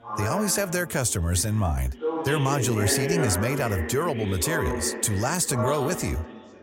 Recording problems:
background chatter; loud; throughout; 4 voices, 5 dB below the speech

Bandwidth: 16 kHz